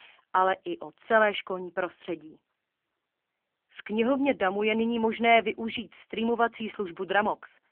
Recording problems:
phone-call audio; poor line; nothing above 3 kHz

